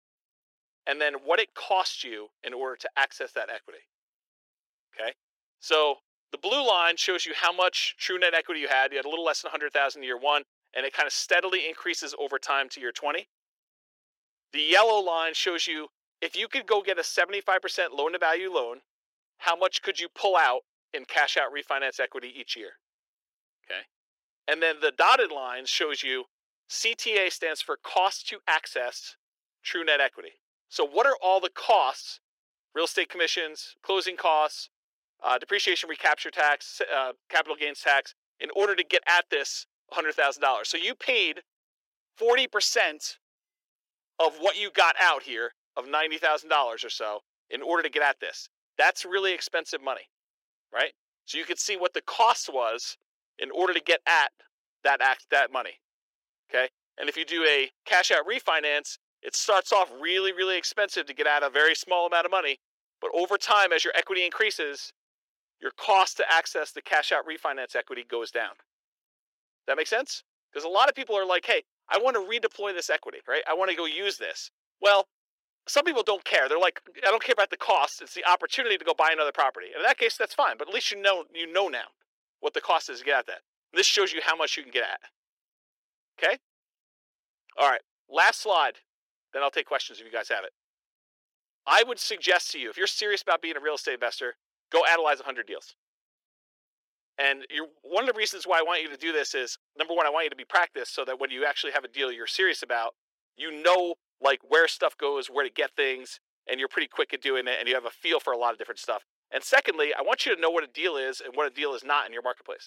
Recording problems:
thin; very; fading below 400 Hz

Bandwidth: 16.5 kHz